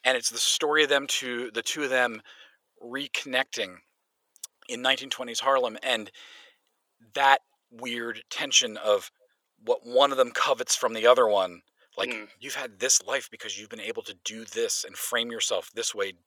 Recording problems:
thin; very; fading below 650 Hz

